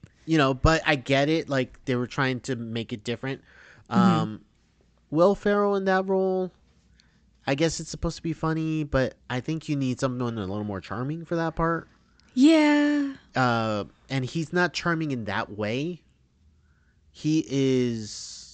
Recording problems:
high frequencies cut off; noticeable; nothing above 8 kHz

